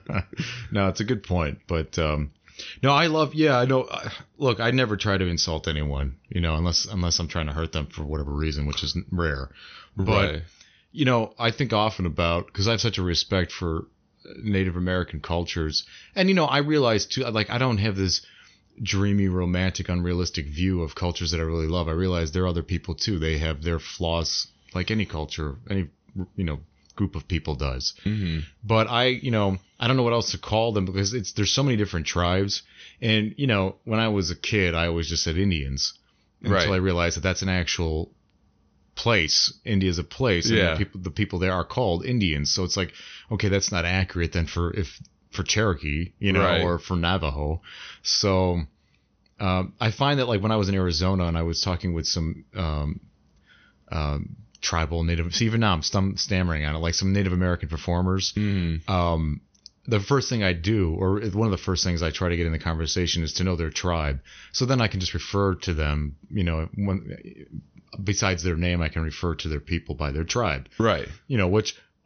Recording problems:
high frequencies cut off; noticeable; nothing above 6 kHz

